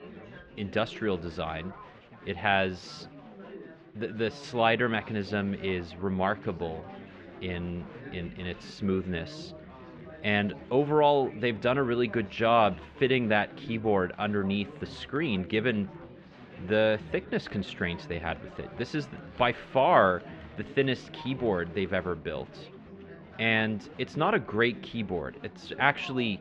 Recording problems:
muffled; very; fading above 3 kHz
chatter from many people; noticeable; throughout; 15 dB below the speech

